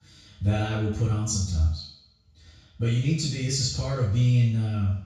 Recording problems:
off-mic speech; far
room echo; noticeable; dies away in 0.6 s

